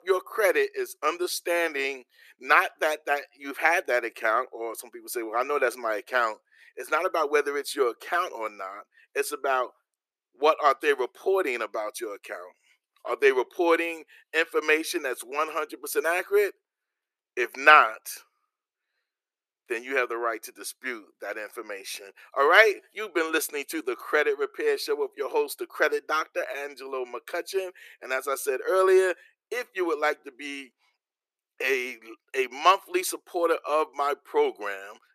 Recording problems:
thin; very; fading below 350 Hz

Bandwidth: 14.5 kHz